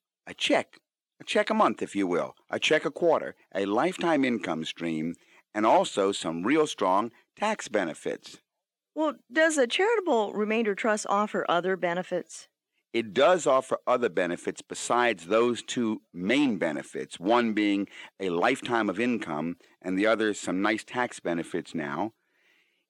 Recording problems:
thin; very slightly; fading below 300 Hz

